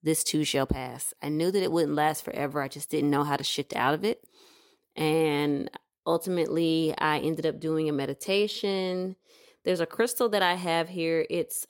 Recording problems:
none

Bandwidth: 16.5 kHz